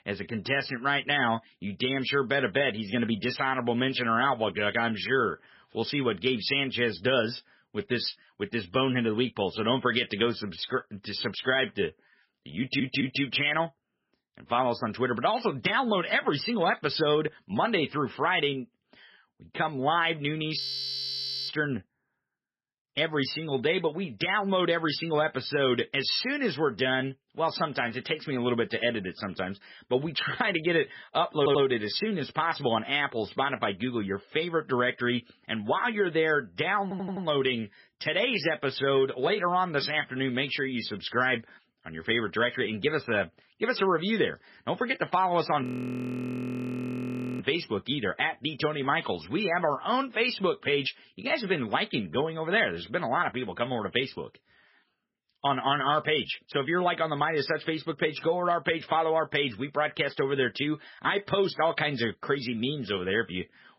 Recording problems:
garbled, watery; badly; nothing above 5.5 kHz
audio stuttering; at 13 s, at 31 s and at 37 s
audio freezing; at 21 s for 1 s and at 46 s for 2 s

